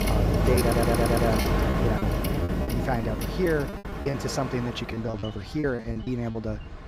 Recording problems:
train or aircraft noise; very loud; throughout; 2 dB above the speech
choppy; very; 11% of the speech affected
audio stuttering; at 0.5 s

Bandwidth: 15.5 kHz